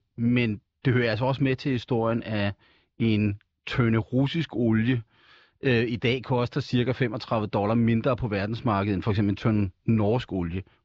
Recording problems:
muffled; very slightly; fading above 4 kHz
high frequencies cut off; slight; nothing above 7.5 kHz

